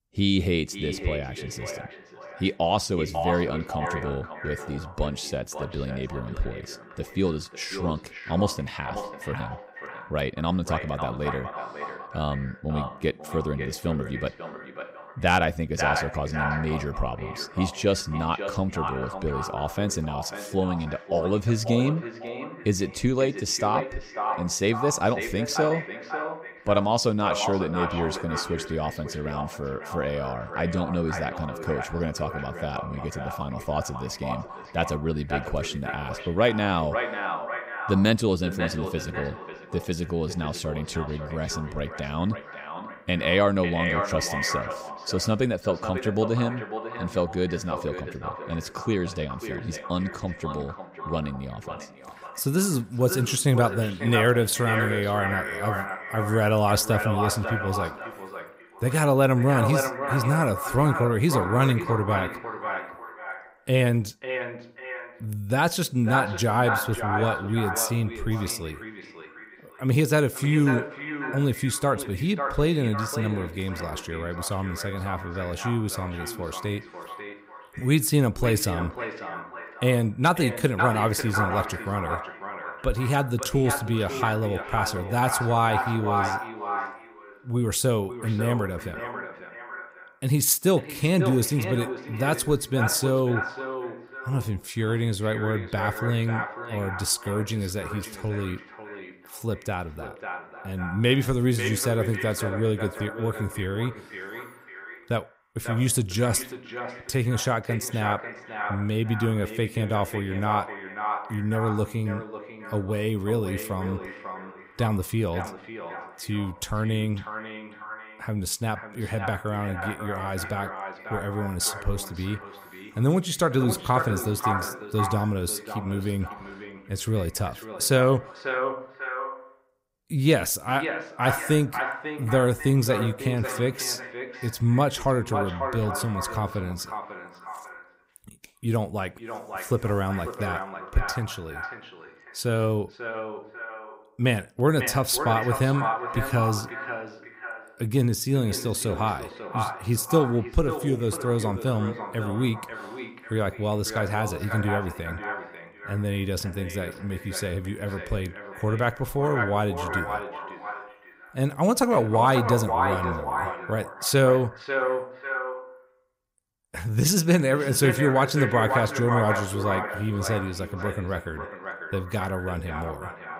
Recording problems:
echo of what is said; strong; throughout; 540 ms later, 7 dB below the speech

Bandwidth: 15.5 kHz